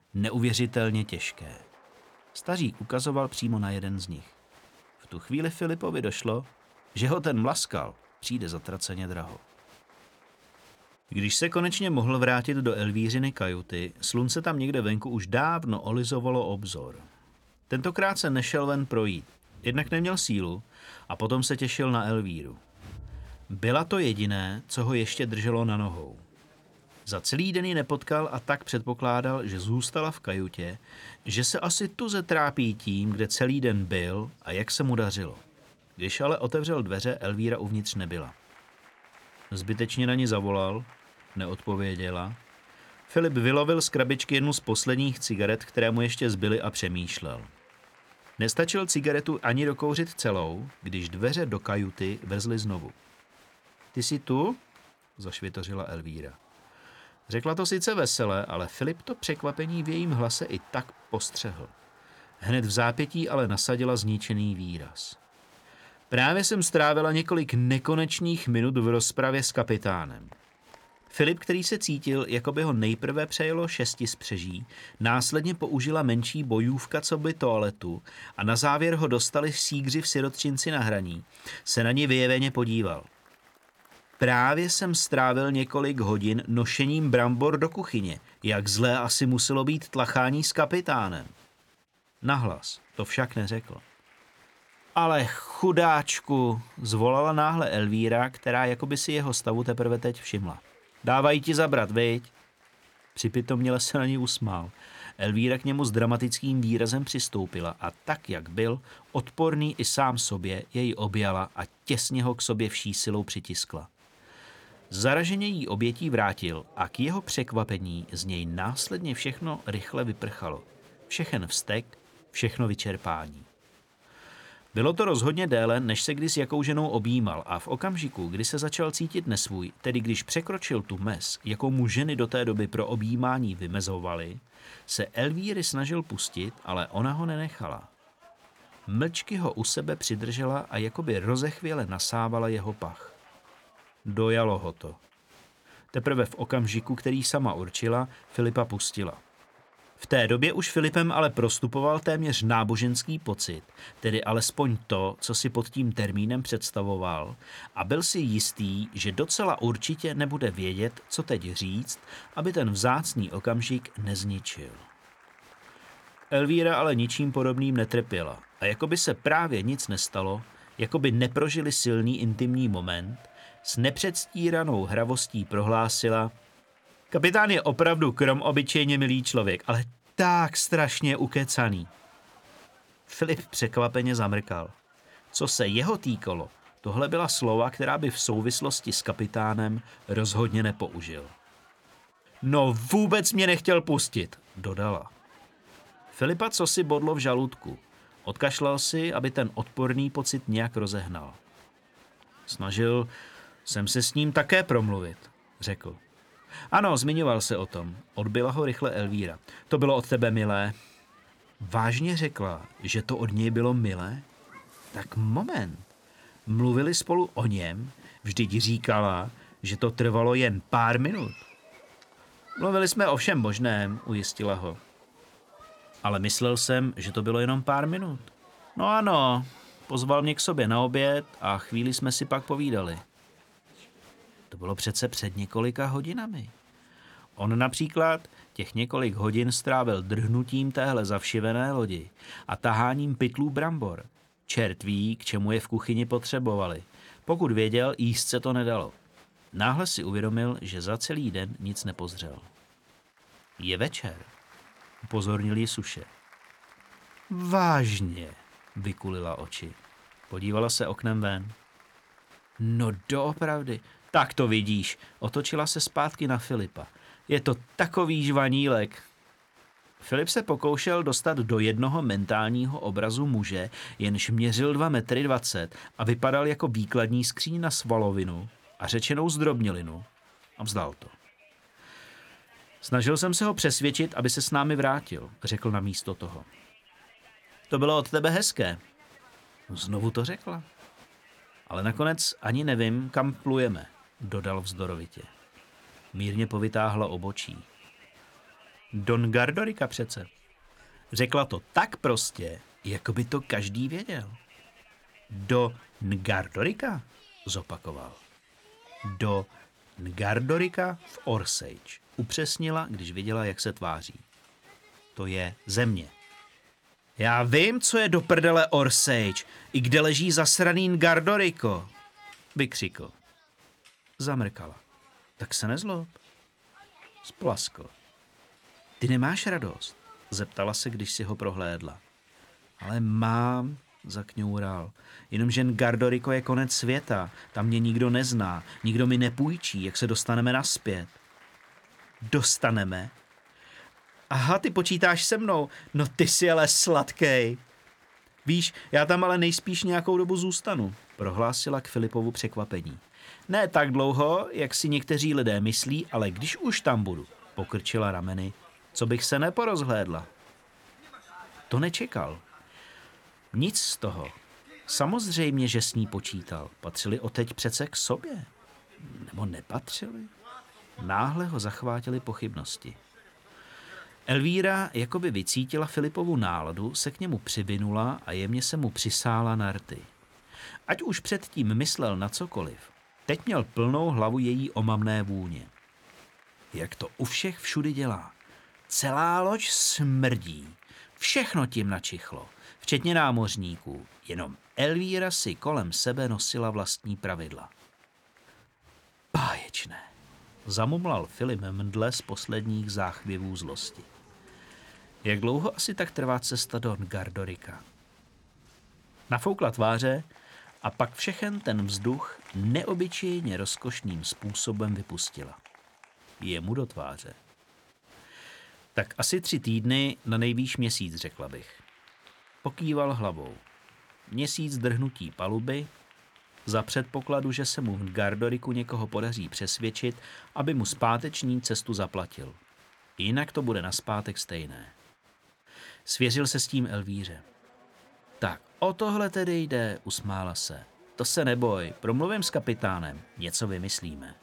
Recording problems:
crowd noise; faint; throughout; 30 dB below the speech

